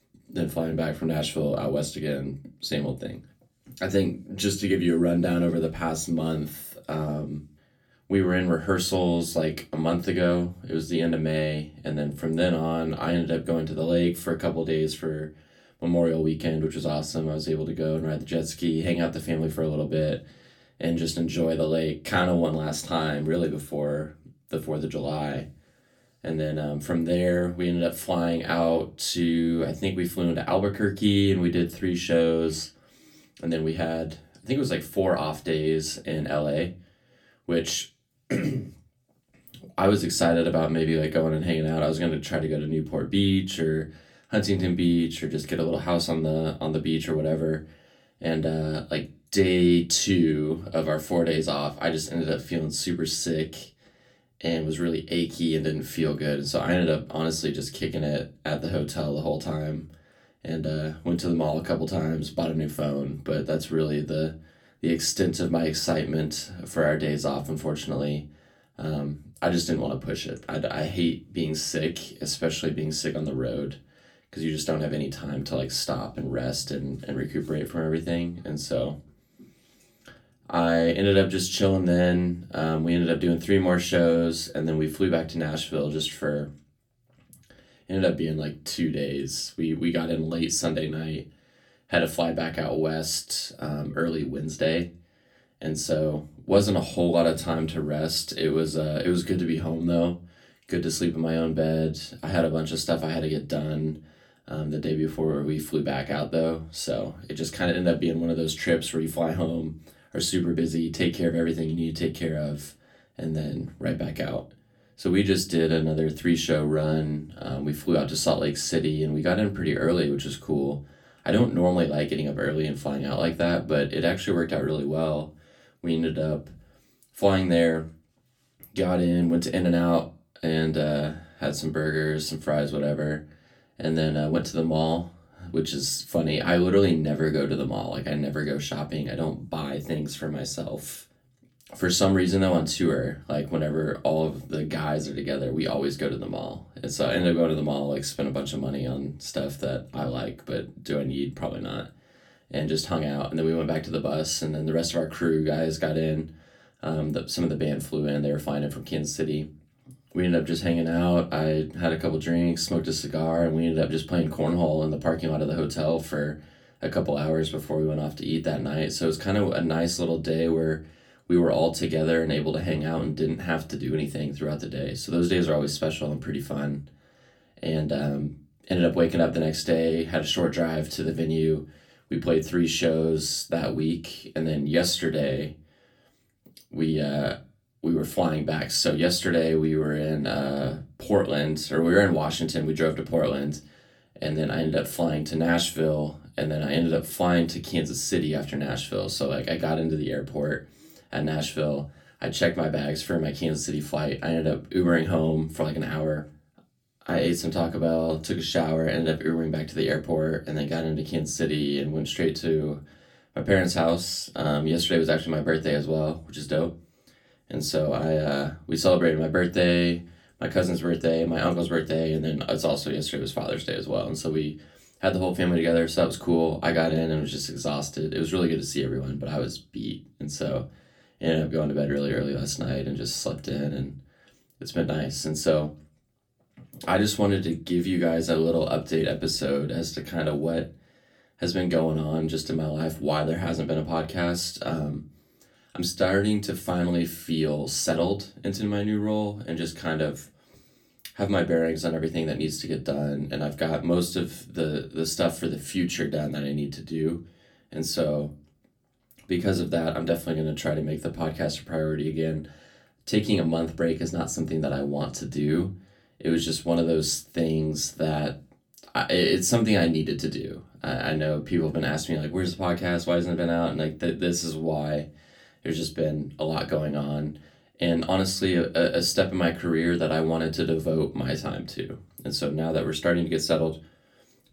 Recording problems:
off-mic speech; far
room echo; very slight; dies away in 0.2 s

